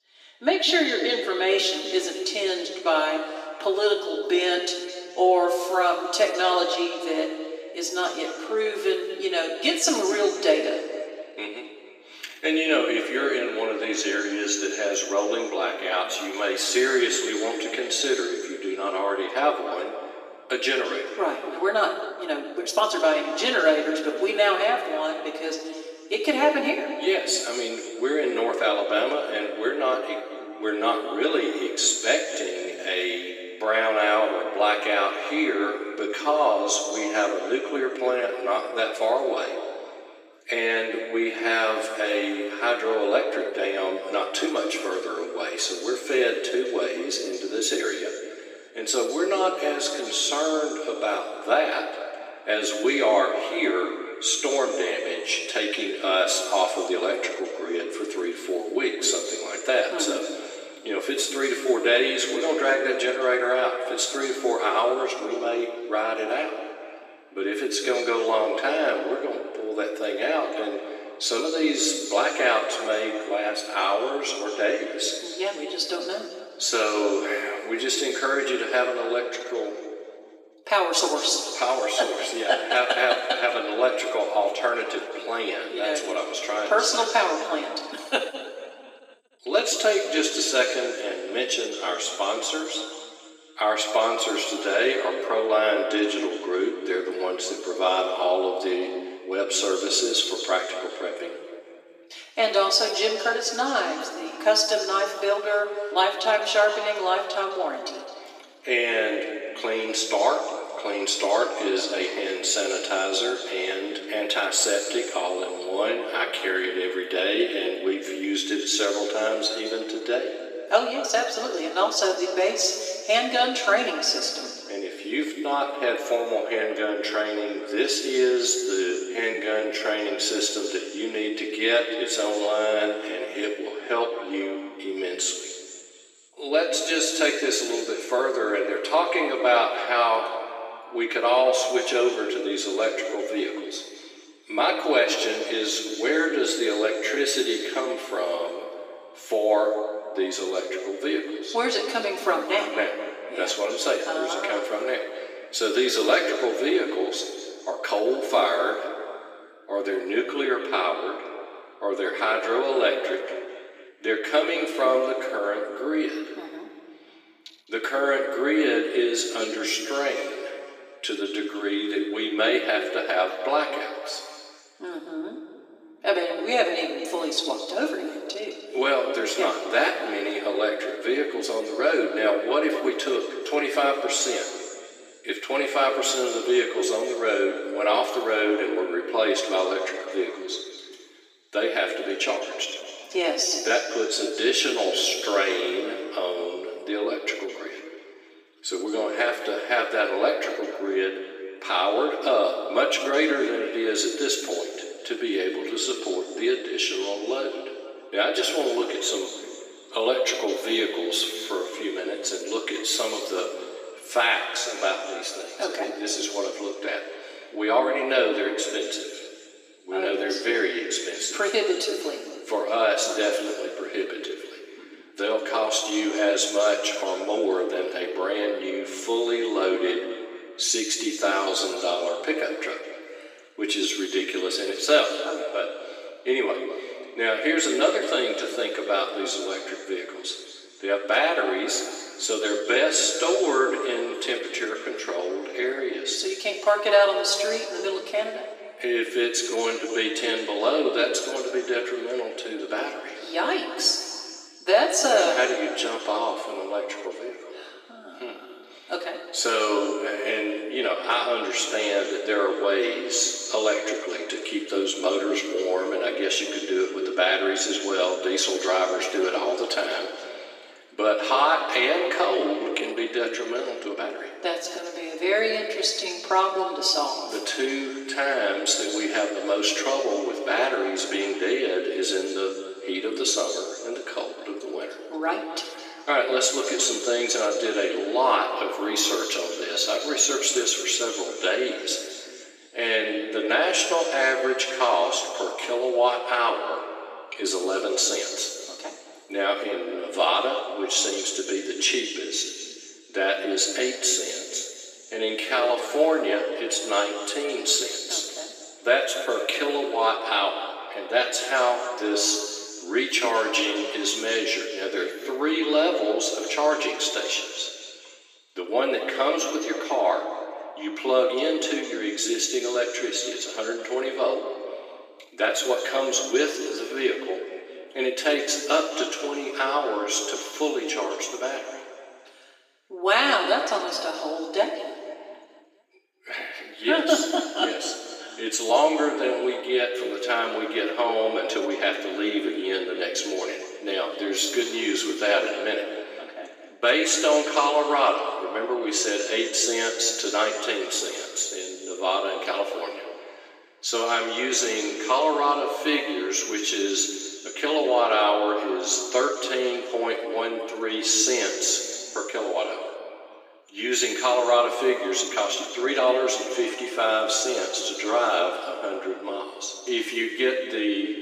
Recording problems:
off-mic speech; far
thin; very; fading below 300 Hz
room echo; noticeable; dies away in 2 s
uneven, jittery; strongly; from 22 s to 6:06

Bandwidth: 15 kHz